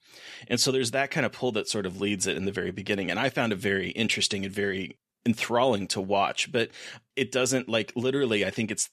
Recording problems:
none

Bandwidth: 14.5 kHz